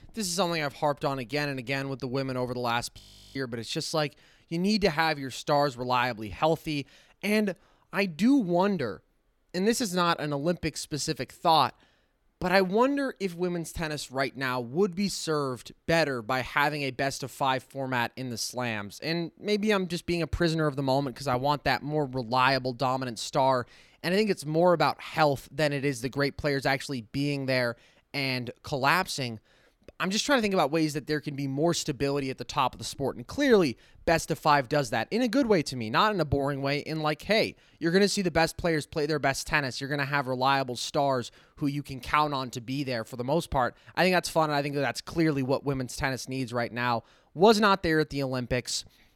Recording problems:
audio freezing; at 3 s

